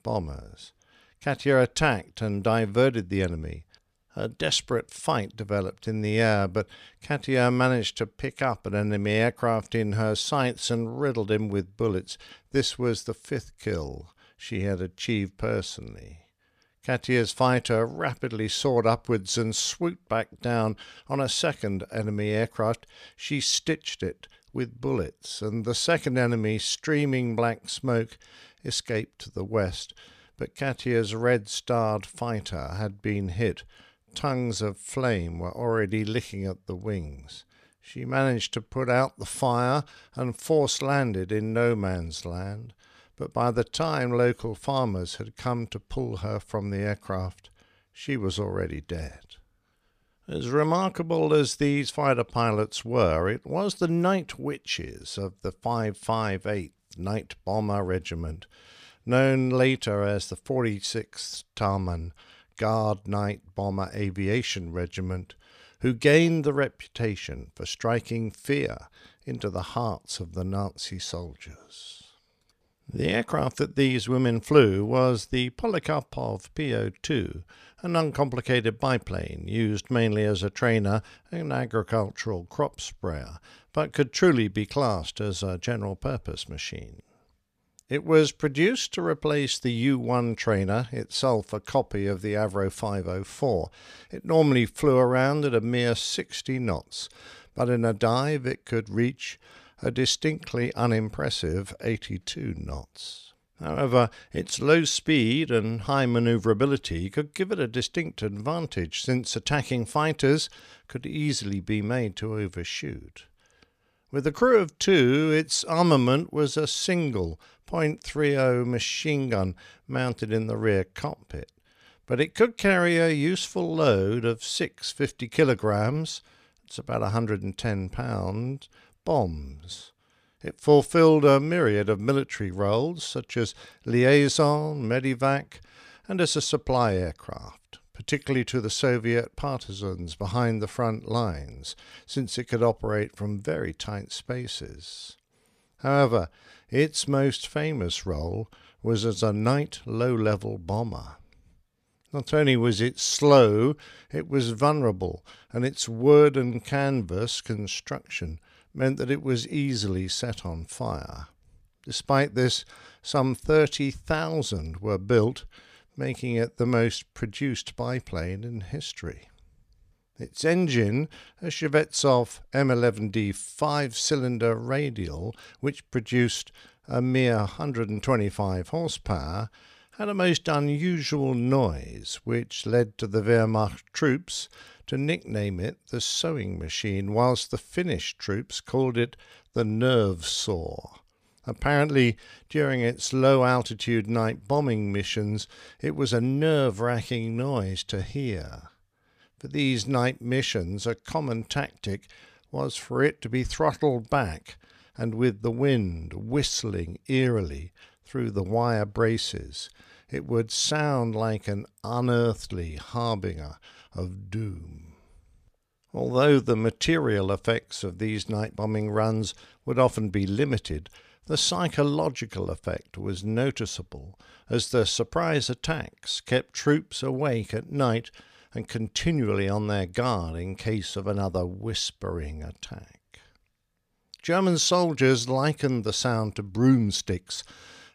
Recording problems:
none

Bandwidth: 14.5 kHz